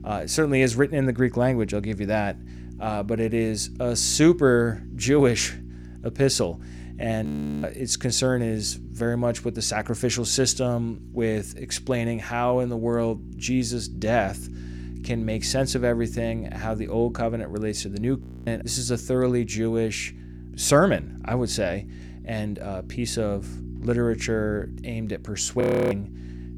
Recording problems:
electrical hum; faint; throughout; 60 Hz, 20 dB below the speech
audio freezing; at 7.5 s, at 18 s and at 26 s

